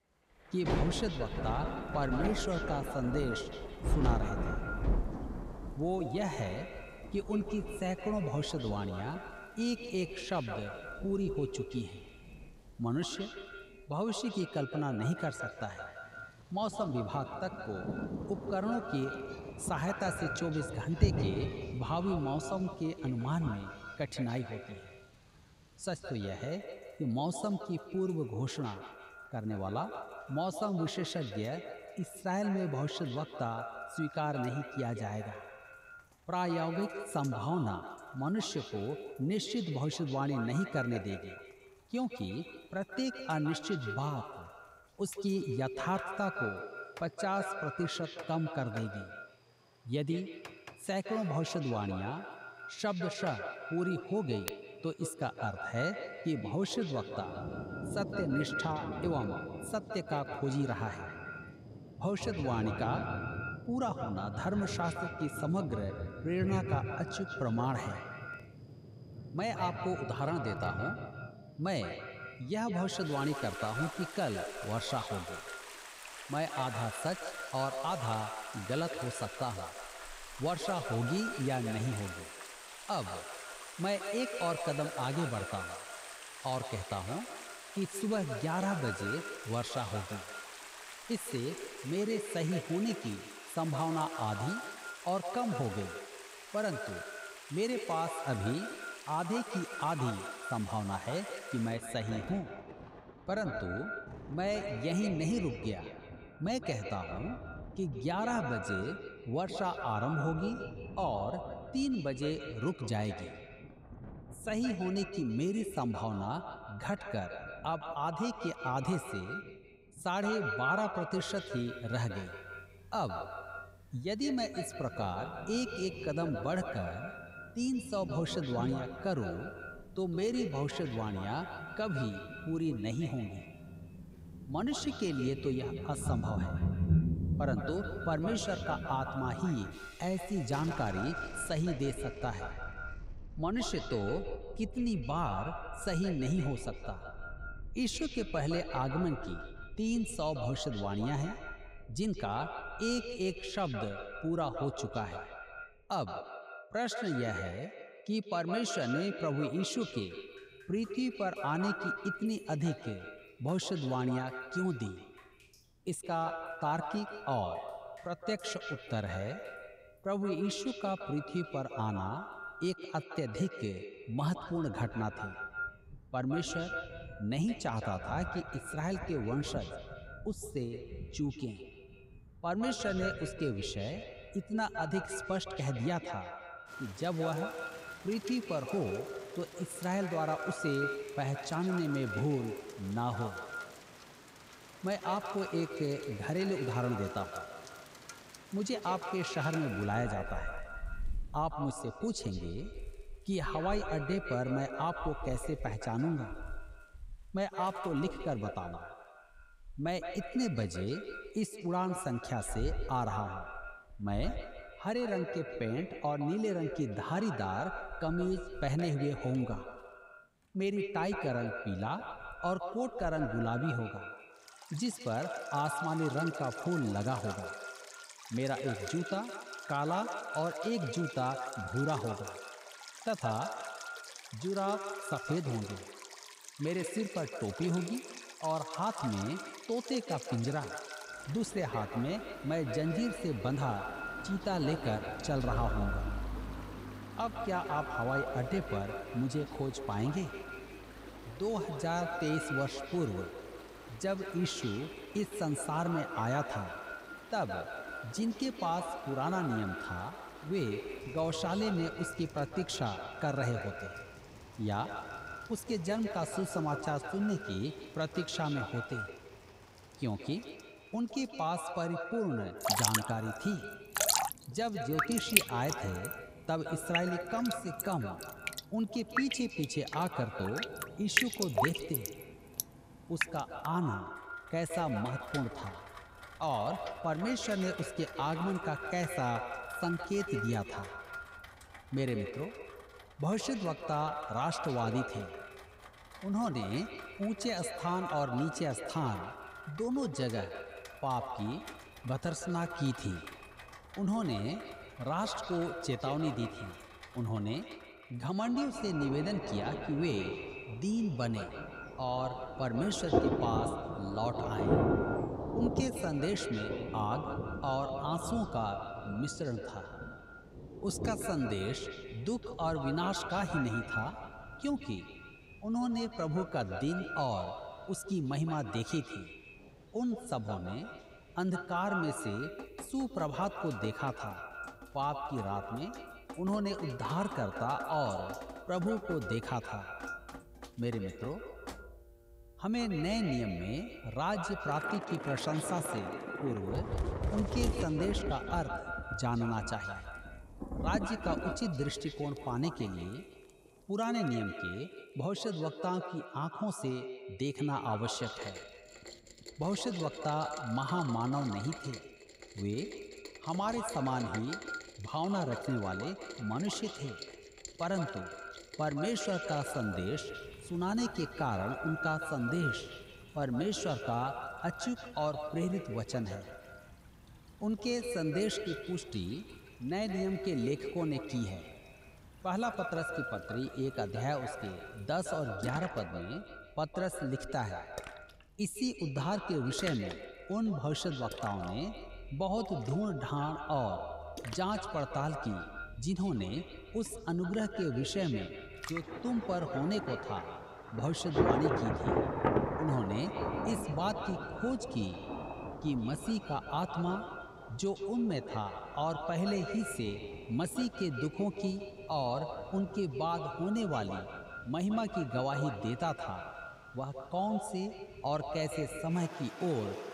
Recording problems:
echo of what is said; strong; throughout; 160 ms later, 7 dB below the speech
rain or running water; loud; throughout; 7 dB below the speech

